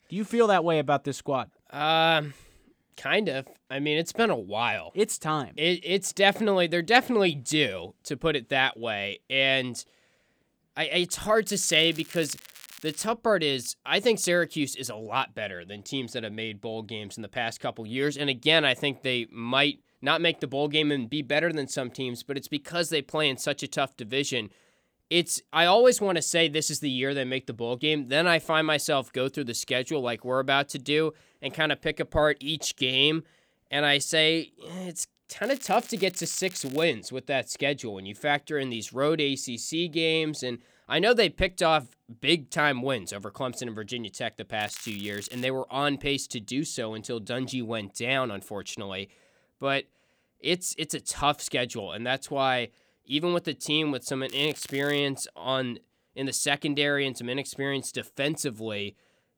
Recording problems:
crackling; noticeable; 4 times, first at 11 s; 20 dB below the speech

